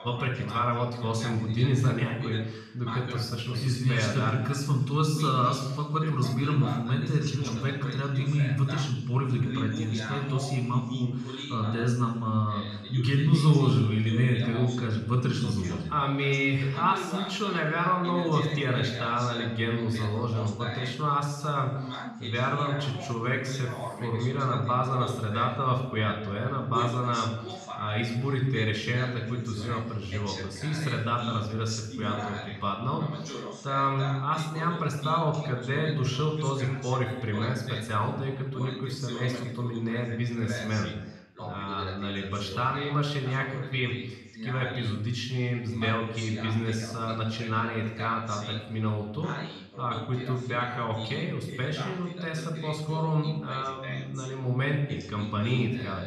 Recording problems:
off-mic speech; far
room echo; noticeable; dies away in 0.9 s
voice in the background; noticeable; throughout; 10 dB below the speech

